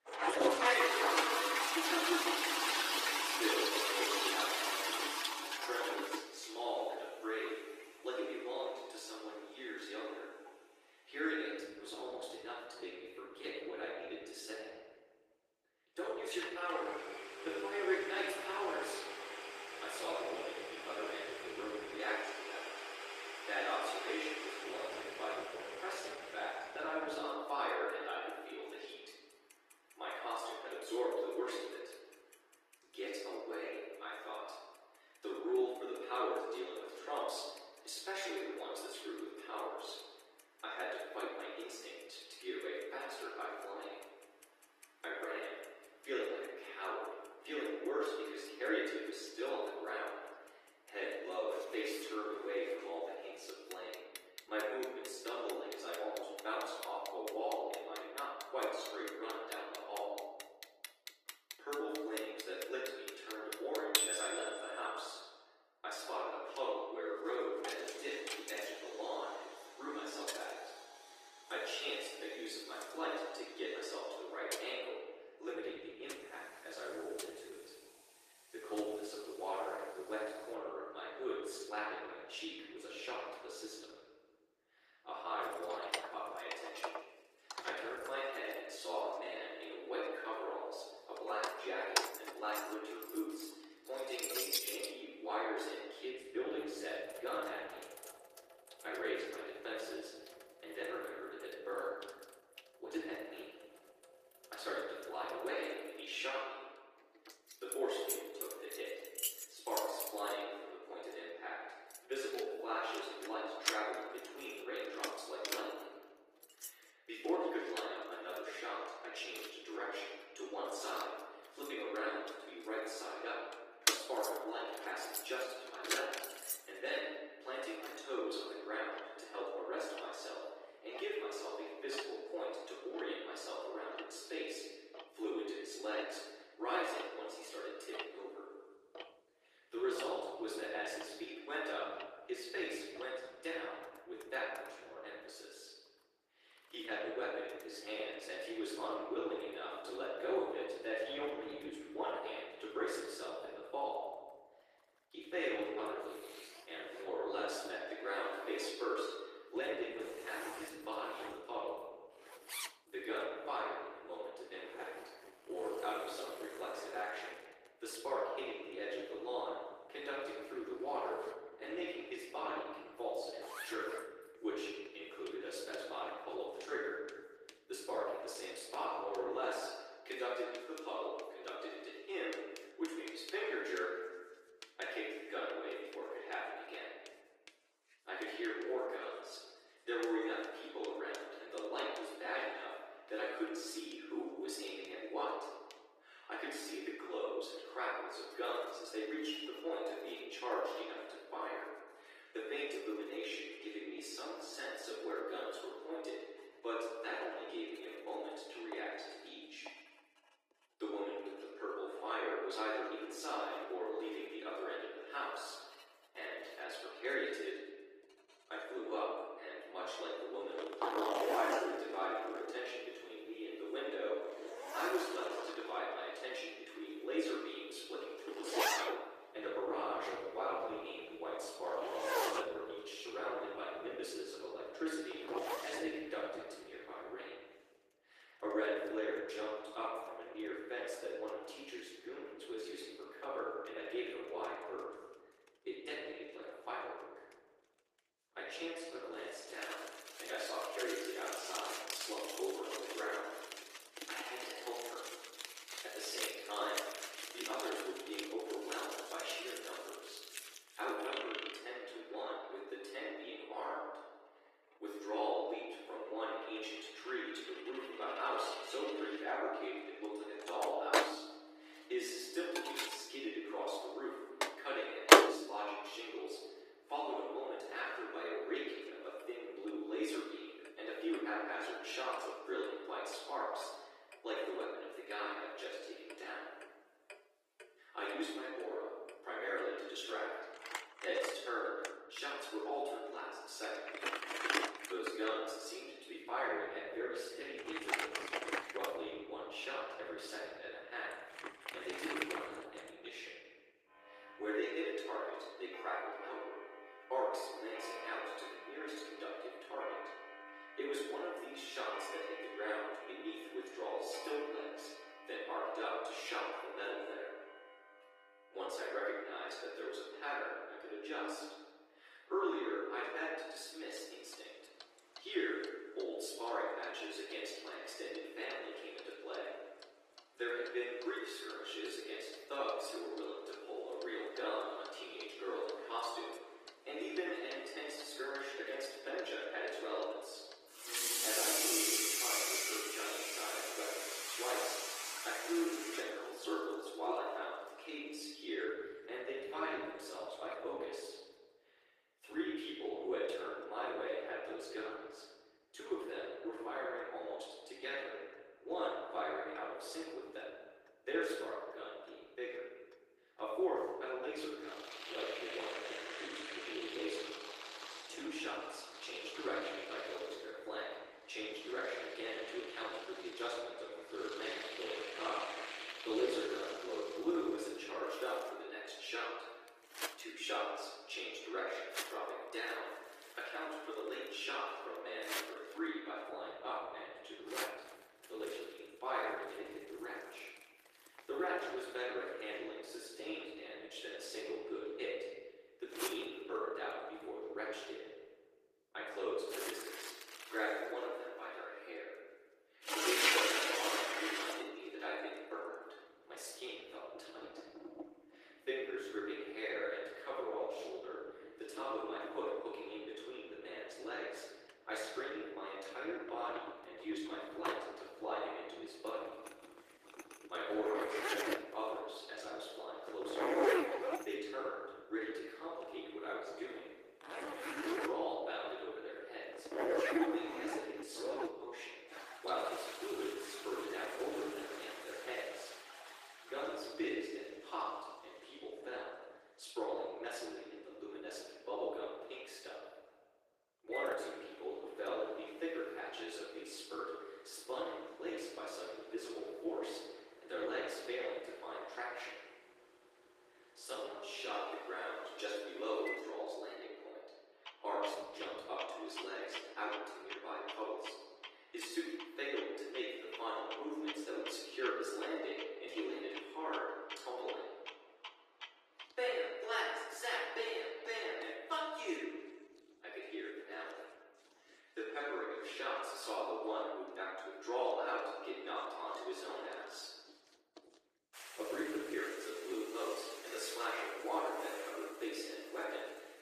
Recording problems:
off-mic speech; far
thin; very; fading below 300 Hz
room echo; noticeable; dies away in 1.2 s
garbled, watery; slightly; nothing above 12 kHz
household noises; very loud; throughout; 1 dB above the speech
uneven, jittery; slightly; from 26 s to 7:36

